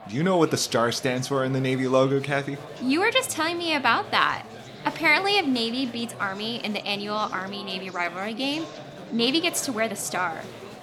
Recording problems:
chatter from many people; noticeable; throughout; 15 dB below the speech

